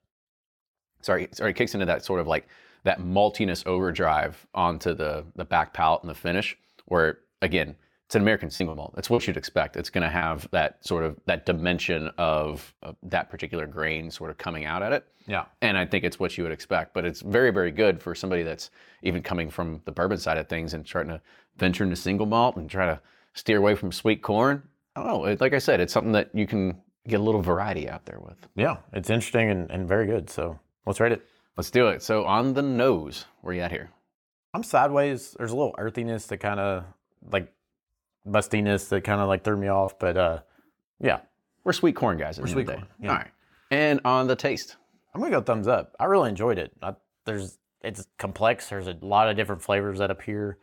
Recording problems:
choppy; very; from 8.5 to 10 s; 7% of the speech affected

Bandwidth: 17.5 kHz